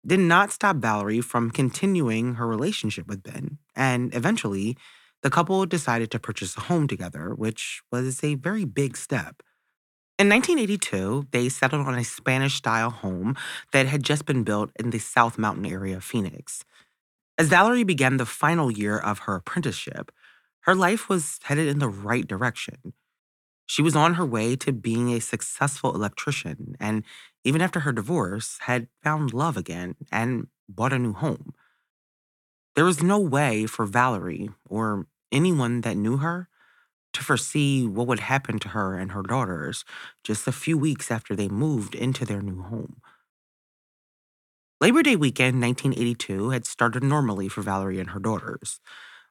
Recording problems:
none

